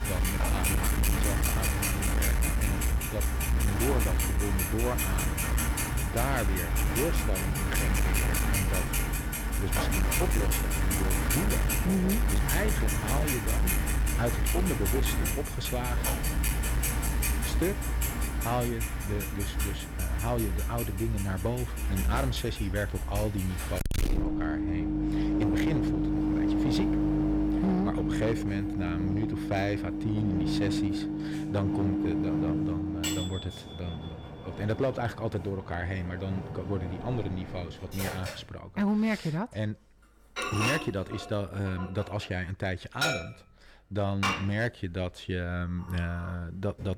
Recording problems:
distortion; heavy; 11% of the sound clipped
household noises; very loud; throughout; 4 dB above the speech

